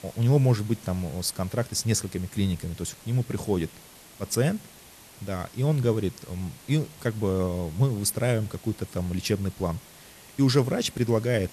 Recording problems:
hiss; faint; throughout; 20 dB below the speech

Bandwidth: 13.5 kHz